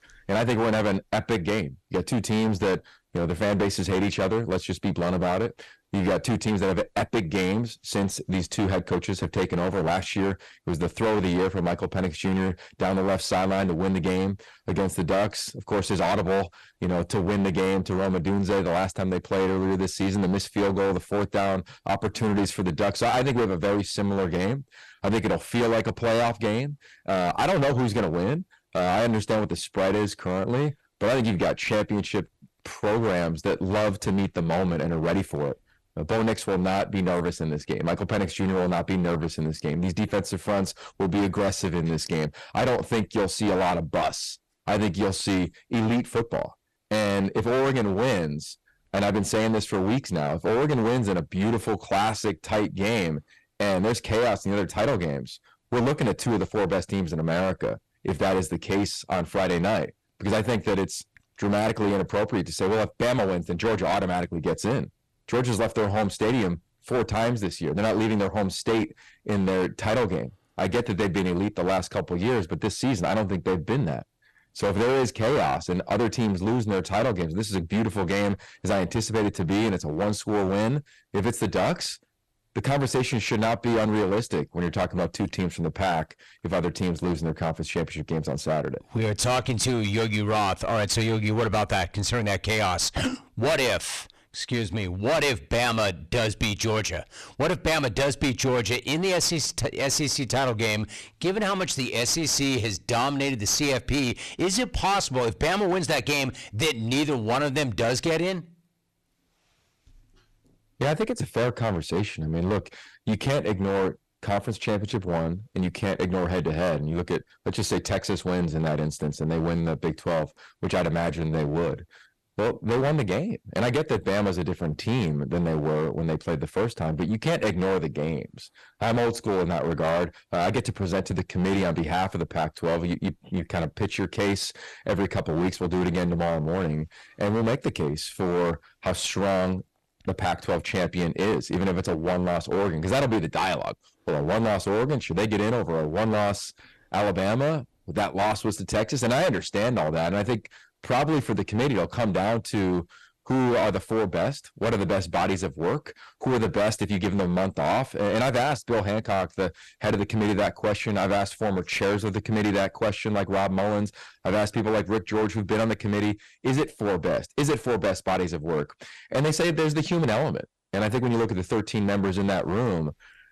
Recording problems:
distortion; heavy; 20% of the sound clipped

